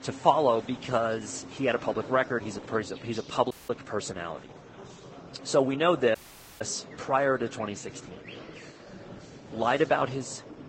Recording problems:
garbled, watery; badly; nothing above 8 kHz
murmuring crowd; noticeable; throughout; 15 dB below the speech
animal sounds; faint; throughout; 25 dB below the speech
audio cutting out; at 3.5 s and at 6 s

